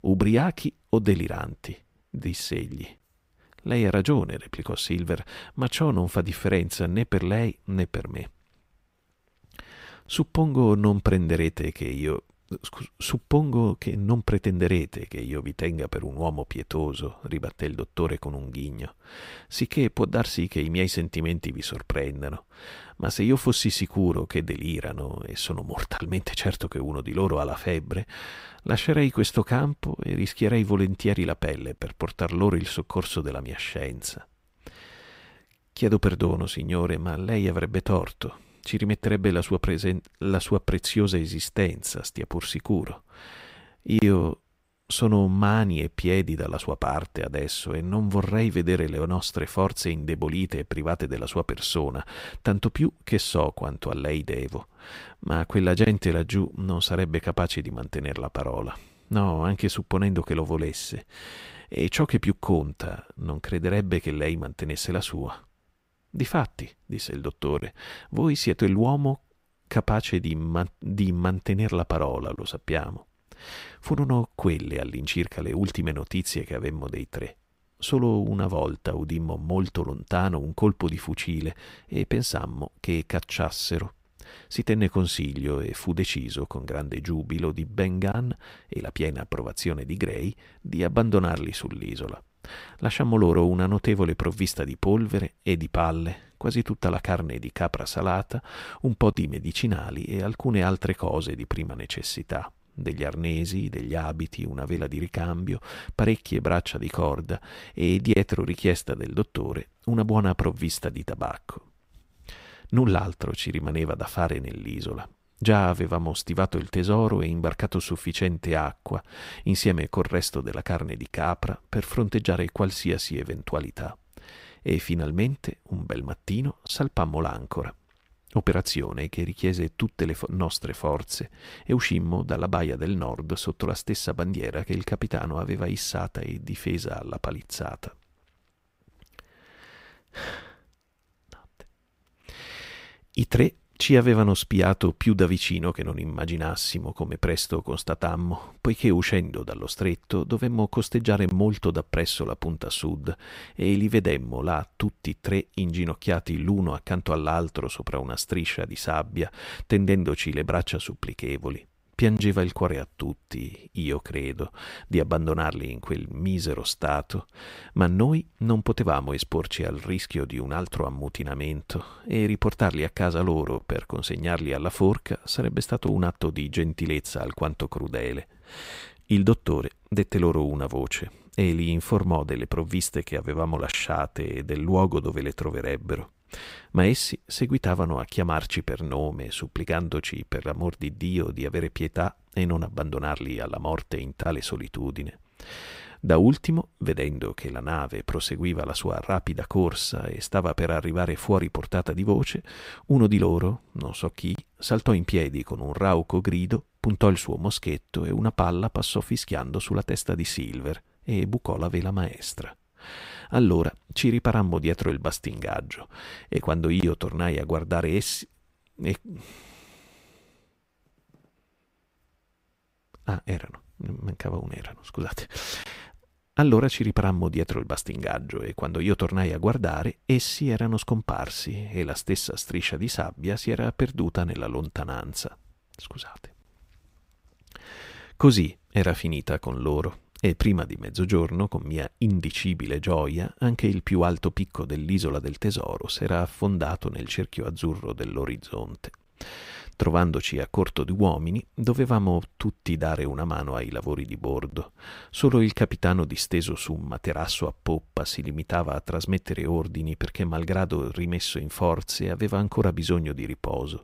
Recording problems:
none

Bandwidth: 15.5 kHz